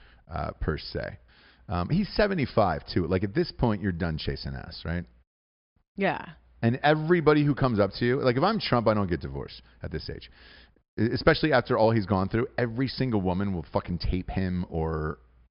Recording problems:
high frequencies cut off; noticeable; nothing above 5.5 kHz

